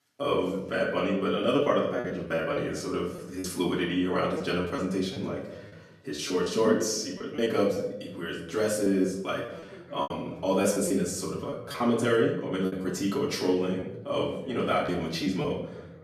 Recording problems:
off-mic speech; far
room echo; noticeable; dies away in 0.8 s
voice in the background; faint; throughout; 25 dB below the speech
choppy; very; 7% of the speech affected

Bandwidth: 14.5 kHz